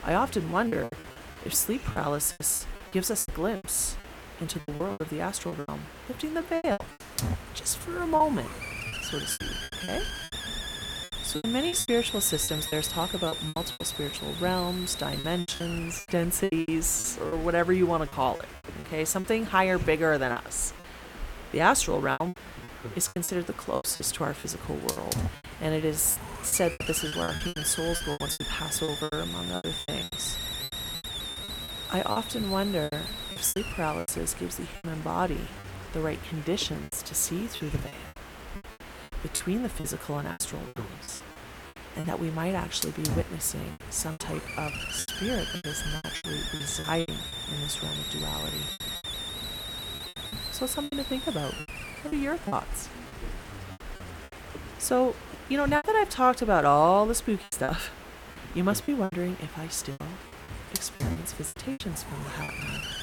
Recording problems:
hiss; loud; throughout; 8 dB below the speech
choppy; very; 13% of the speech affected

